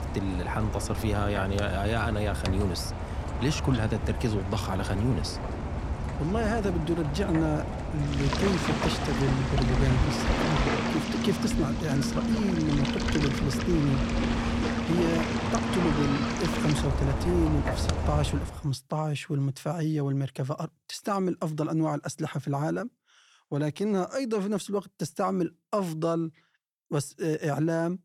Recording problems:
rain or running water; loud; until 18 s; as loud as the speech

